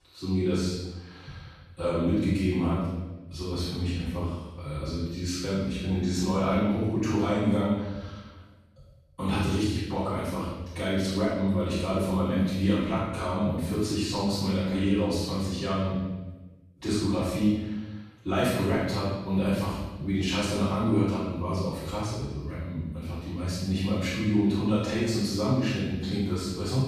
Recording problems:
room echo; strong; dies away in 1 s
off-mic speech; far

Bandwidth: 13.5 kHz